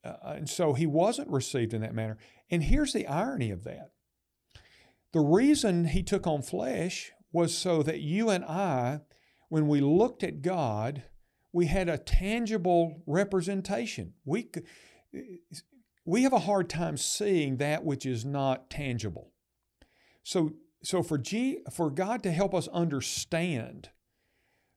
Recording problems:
none

